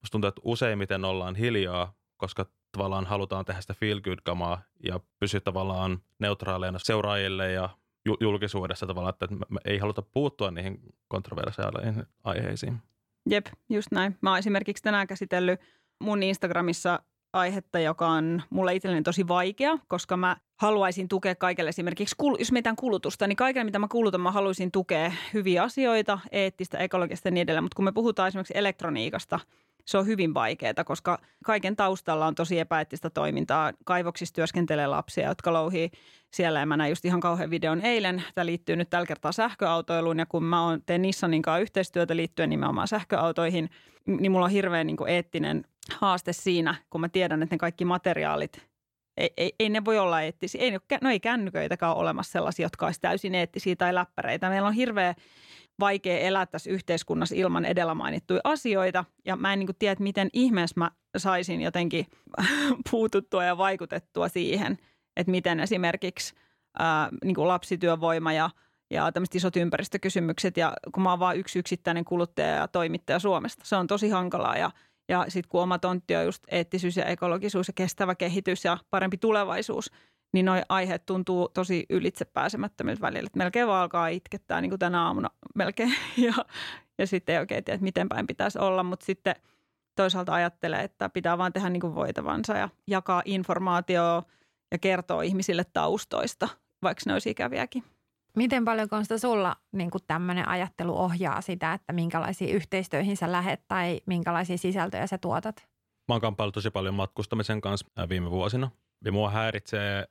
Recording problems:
none

